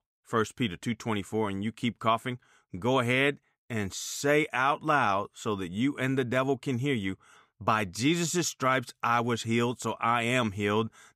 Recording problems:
none

